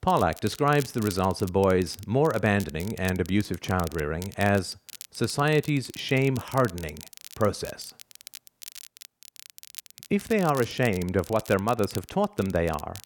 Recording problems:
crackle, like an old record; noticeable; 15 dB below the speech

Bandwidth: 17.5 kHz